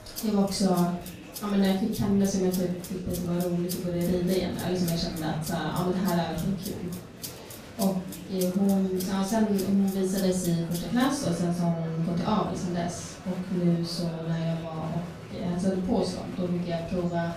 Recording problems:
off-mic speech; far
room echo; noticeable; dies away in 0.5 s
background music; noticeable; throughout; 15 dB below the speech
murmuring crowd; noticeable; throughout; 15 dB below the speech

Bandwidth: 15 kHz